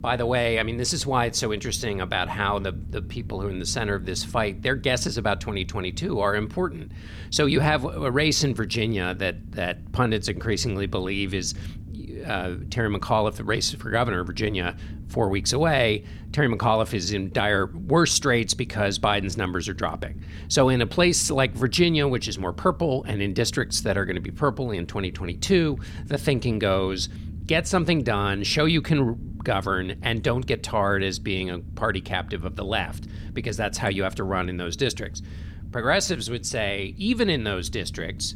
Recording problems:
low rumble; faint; throughout; 25 dB below the speech

